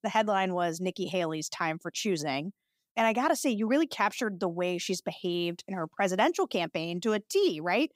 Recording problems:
none

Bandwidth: 15.5 kHz